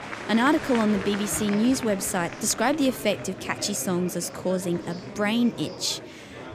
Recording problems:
murmuring crowd; noticeable; throughout; 10 dB below the speech

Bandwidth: 15 kHz